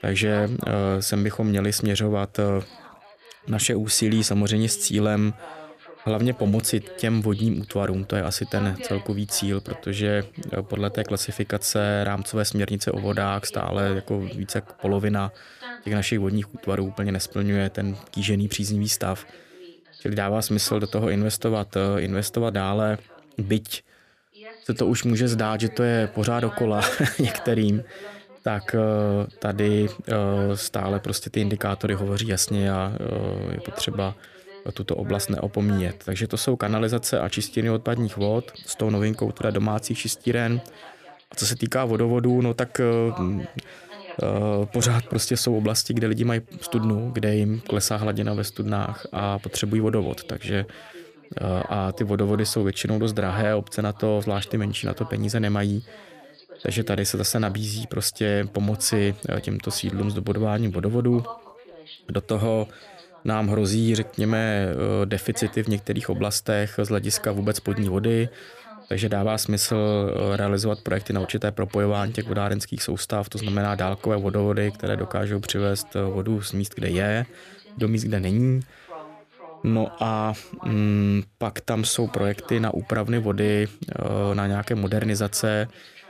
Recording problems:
background chatter; noticeable; throughout; 2 voices, 20 dB below the speech

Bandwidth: 14.5 kHz